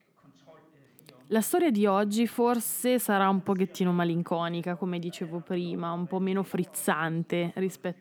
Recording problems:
voice in the background; faint; throughout; 30 dB below the speech

